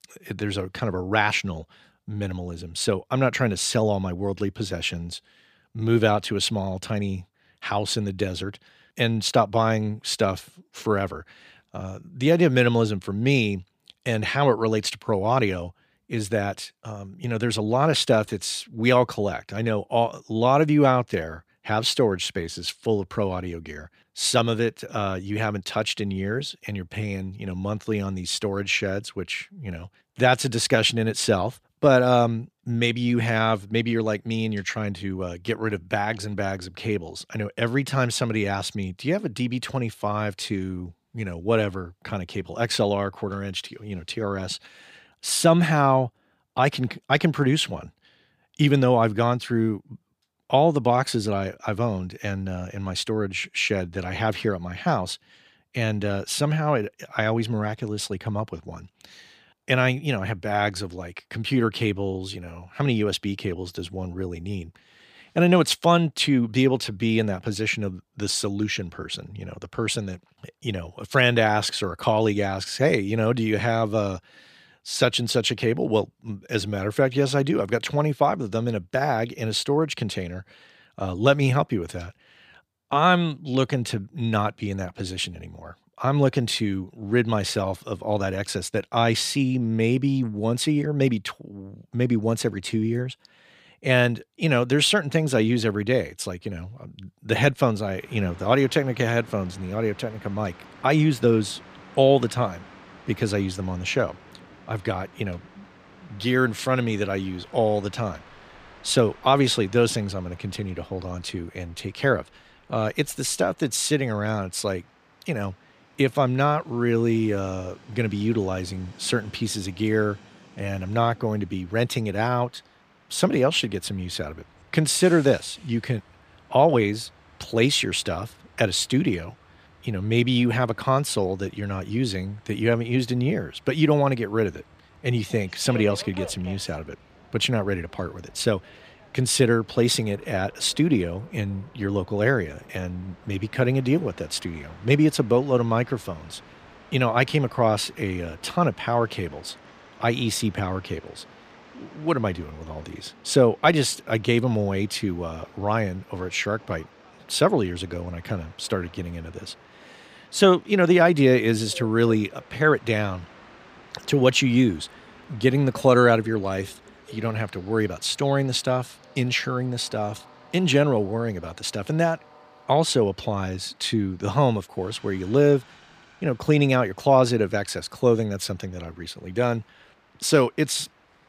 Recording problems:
train or aircraft noise; faint; from 1:38 on; 25 dB below the speech

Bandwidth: 15 kHz